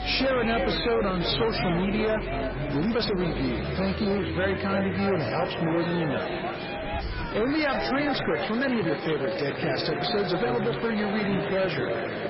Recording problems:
echo of what is said; strong; throughout; 340 ms later, 10 dB below the speech
garbled, watery; badly; nothing above 5.5 kHz
distortion; slight; 14% of the sound clipped
chatter from many people; loud; throughout; 5 dB below the speech
traffic noise; noticeable; throughout; 10 dB below the speech
uneven, jittery; strongly; from 0.5 to 10 s

